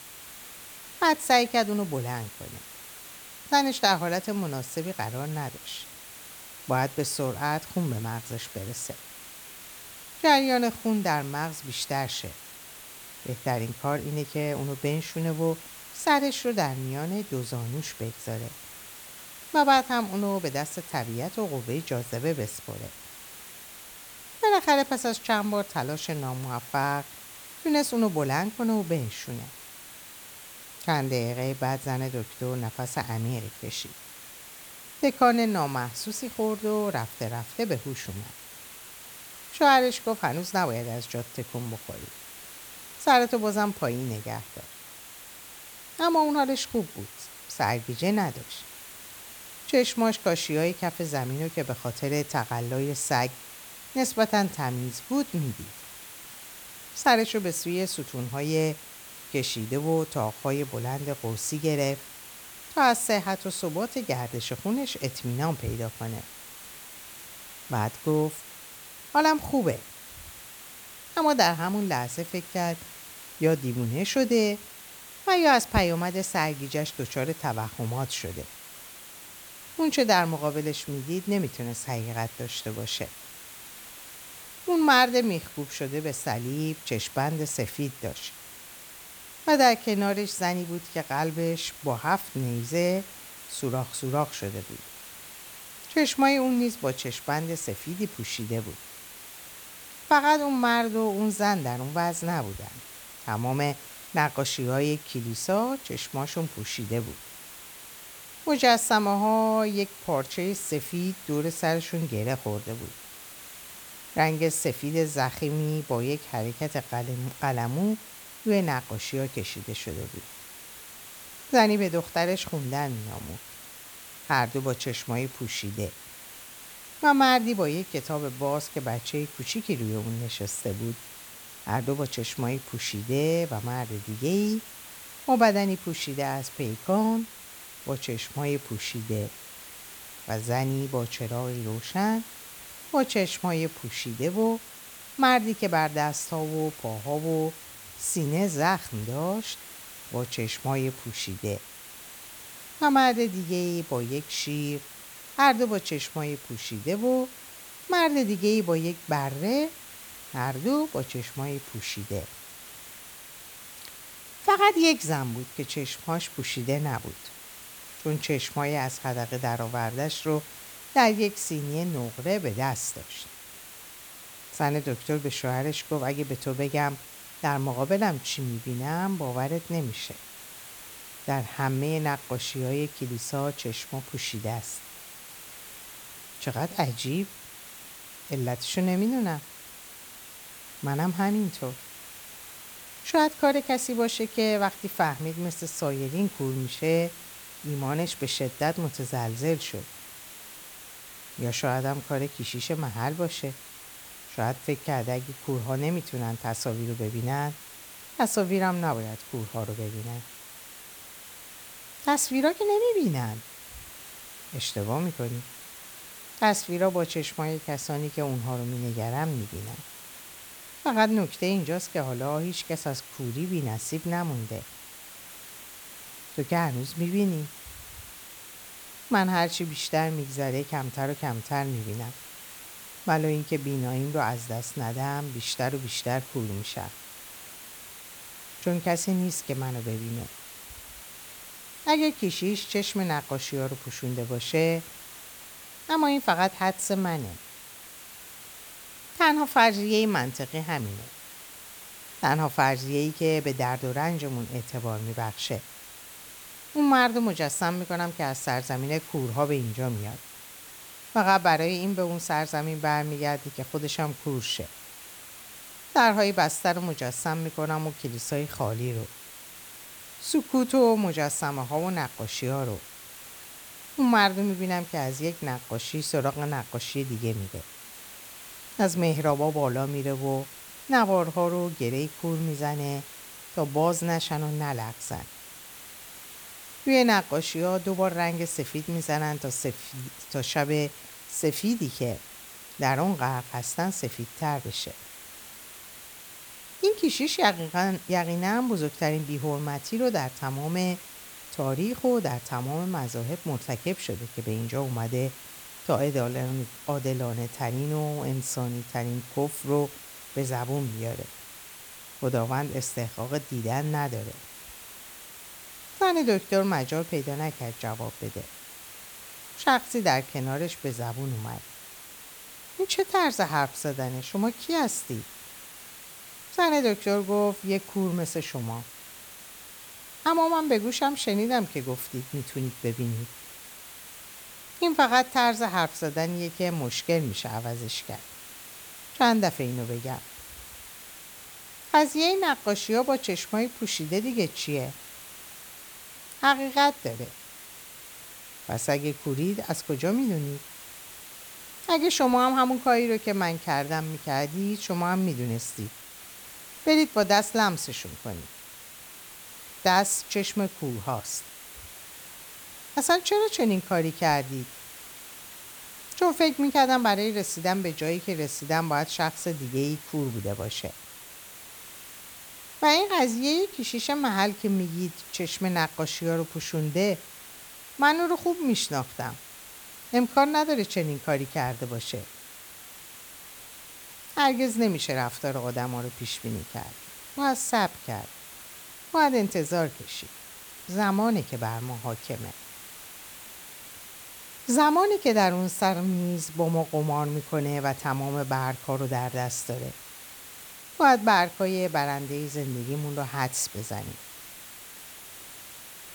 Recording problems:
hiss; noticeable; throughout; 15 dB below the speech

